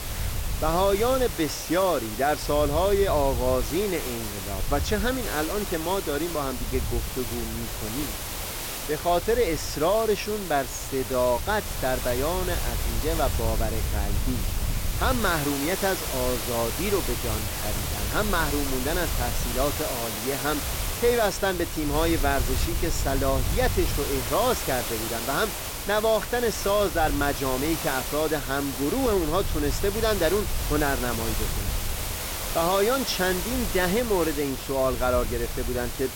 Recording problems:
hiss; loud; throughout; 5 dB below the speech
wind noise on the microphone; occasional gusts; 25 dB below the speech

